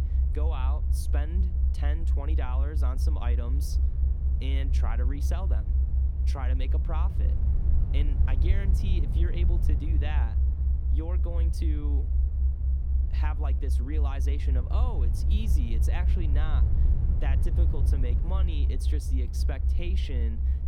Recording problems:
low rumble; loud; throughout; 3 dB below the speech

